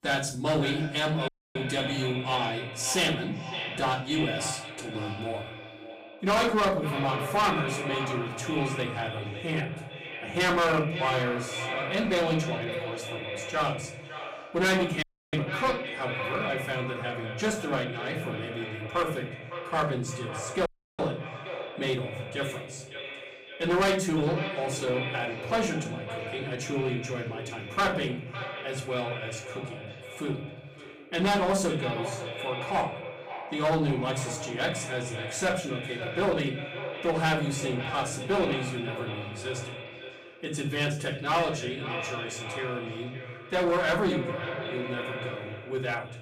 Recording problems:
distortion; heavy; 7% of the sound clipped
echo of what is said; strong; throughout; 560 ms later, 7 dB below the speech
off-mic speech; far
room echo; slight; dies away in 0.5 s
audio cutting out; at 1.5 s, at 15 s and at 21 s

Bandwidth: 15.5 kHz